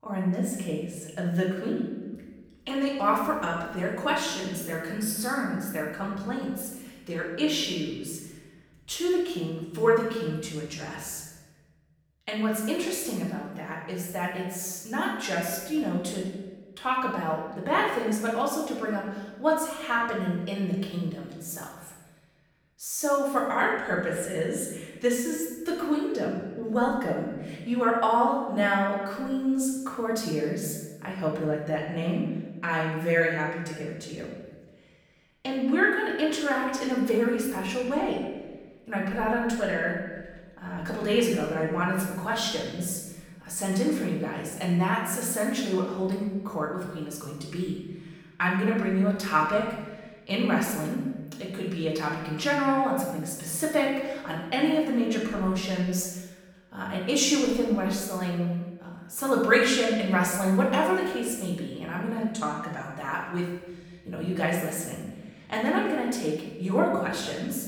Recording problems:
off-mic speech; far
room echo; noticeable; dies away in 1.2 s

